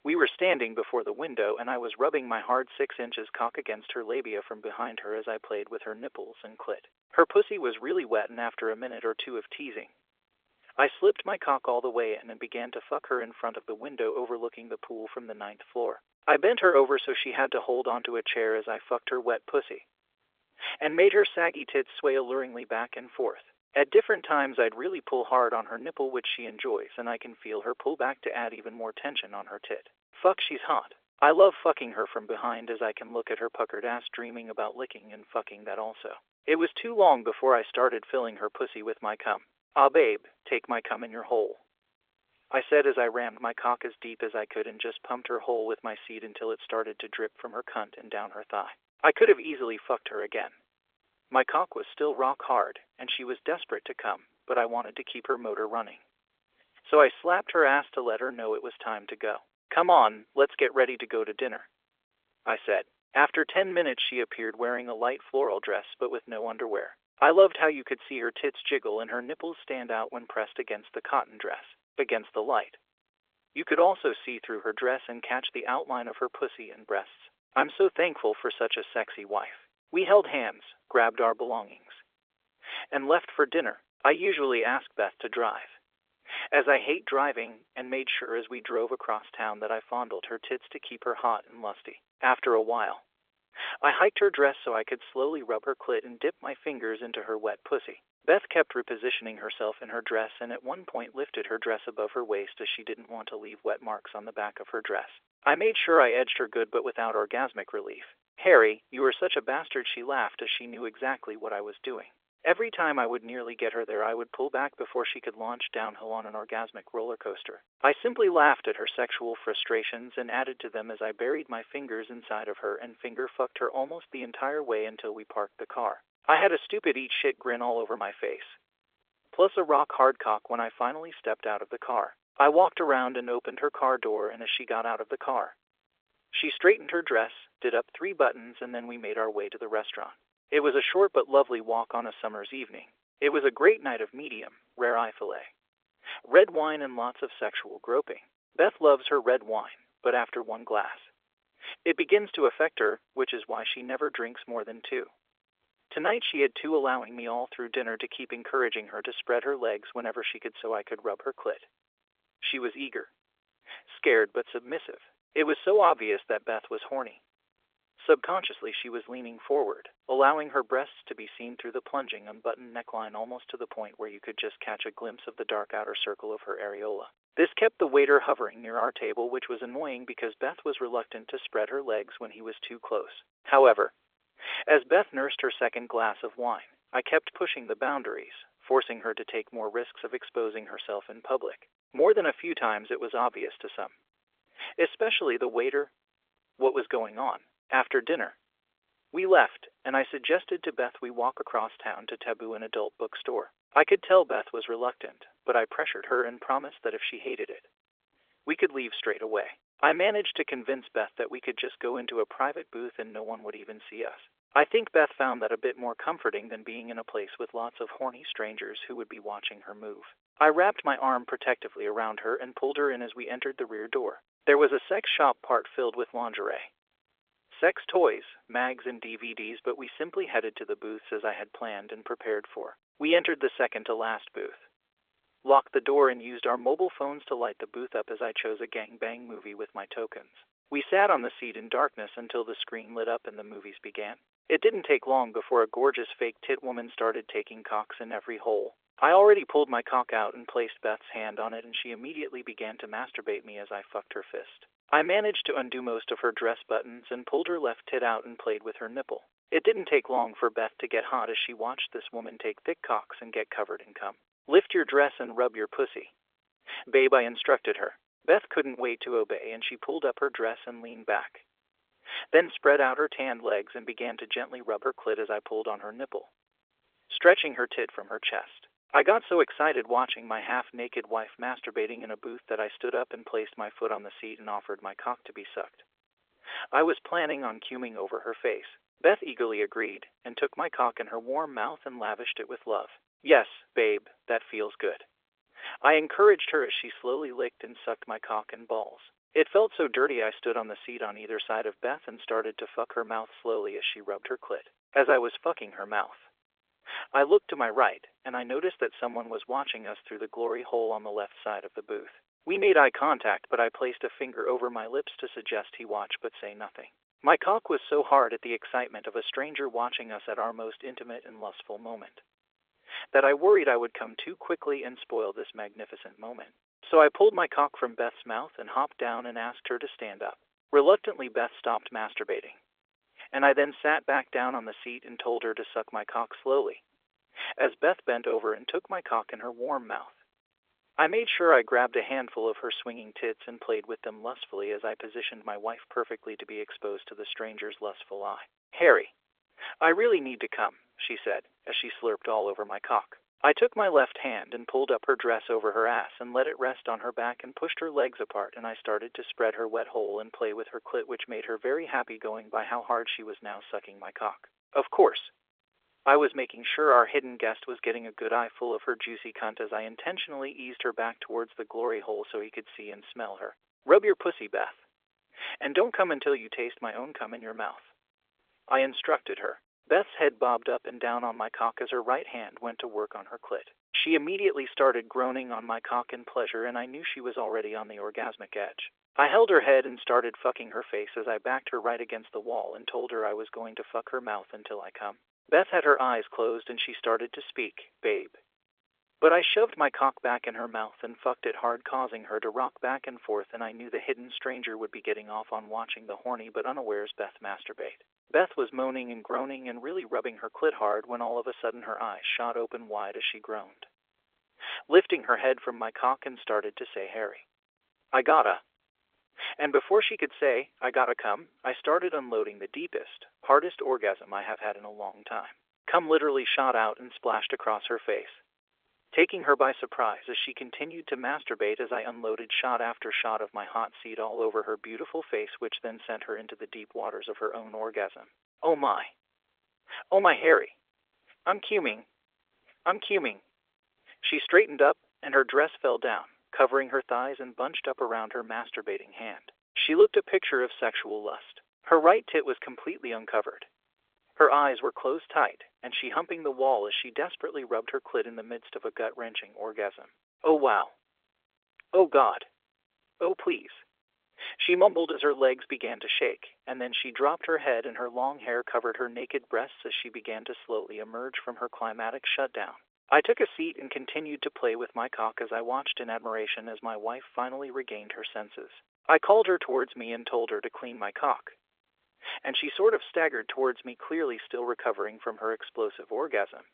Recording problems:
phone-call audio; nothing above 3.5 kHz

